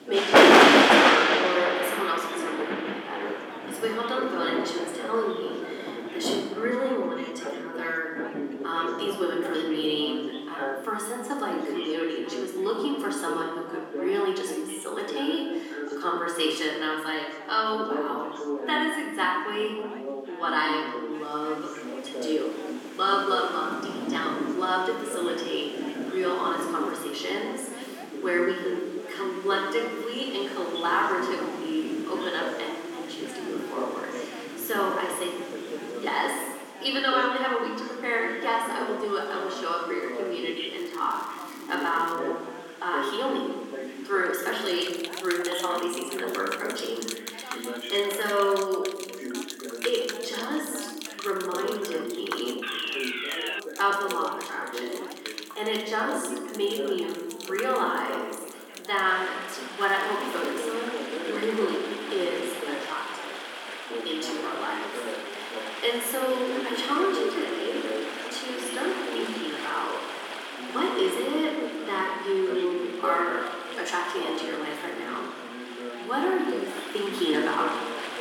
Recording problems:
room echo; noticeable; dies away in 1.4 s
off-mic speech; somewhat distant
thin; very slightly; fading below 250 Hz
rain or running water; loud; throughout; as loud as the speech
background chatter; loud; throughout; 2 voices, 9 dB below the speech
crackling; faint; from 41 to 42 s and at 1:00; 20 dB below the speech
alarm; loud; at 53 s; peak level with the speech

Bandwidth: 17 kHz